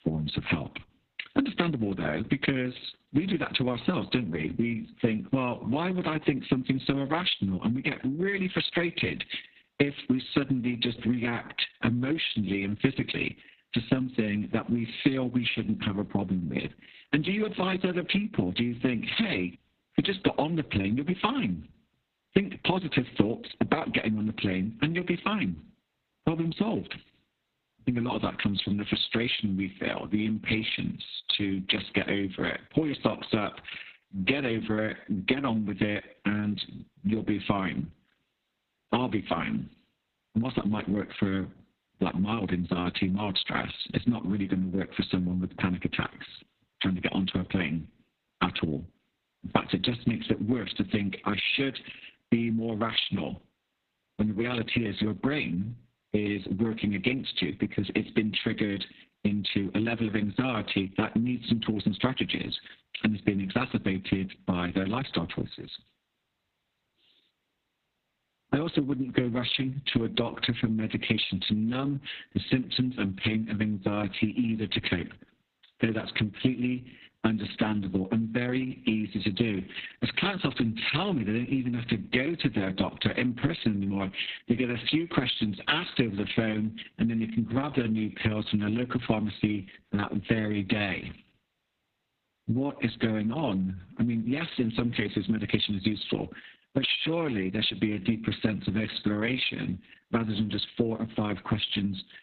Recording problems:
garbled, watery; badly; nothing above 4 kHz
squashed, flat; somewhat

